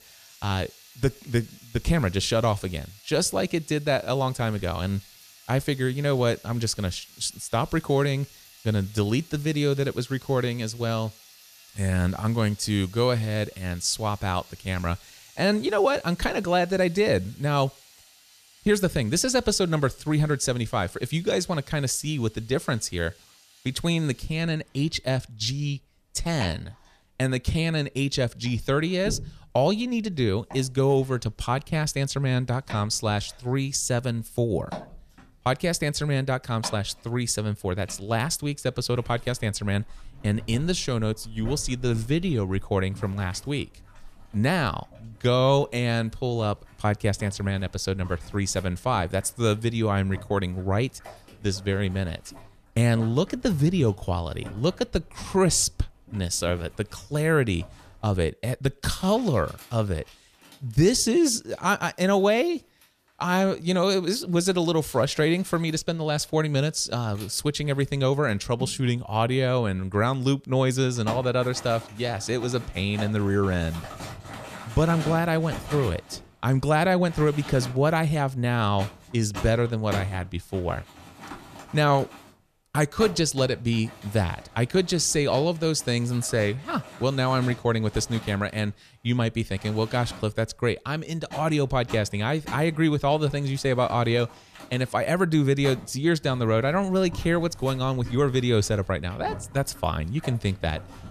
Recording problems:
household noises; noticeable; throughout; 20 dB below the speech

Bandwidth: 14.5 kHz